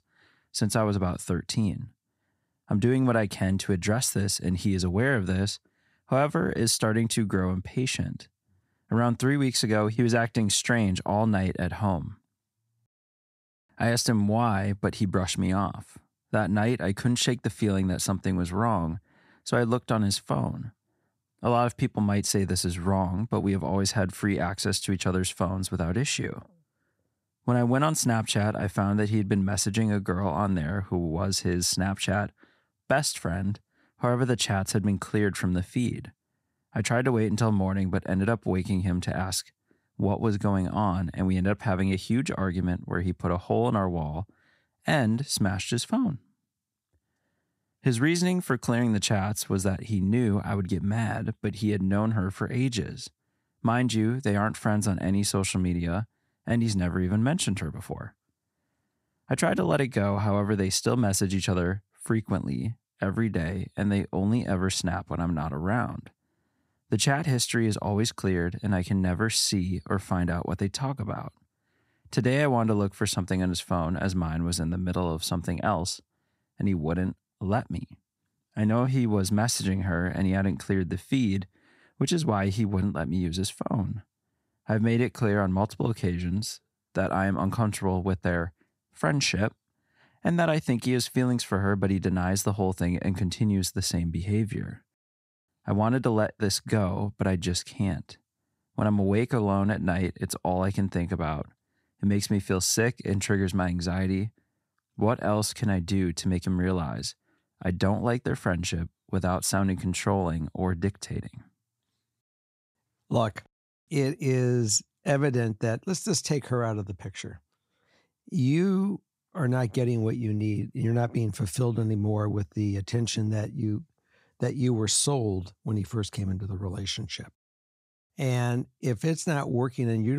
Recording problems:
abrupt cut into speech; at the end

